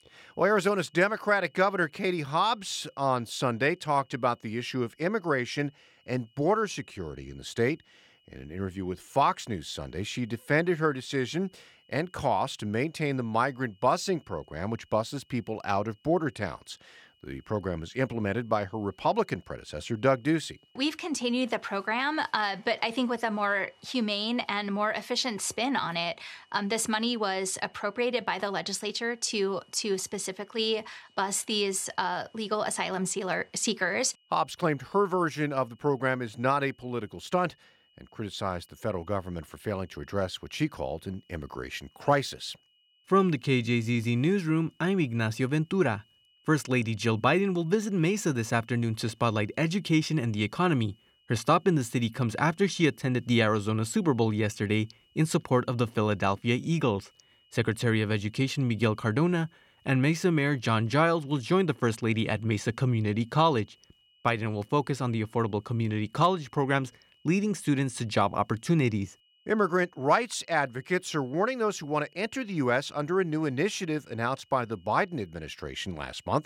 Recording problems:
high-pitched whine; faint; throughout; 3 kHz, 35 dB below the speech

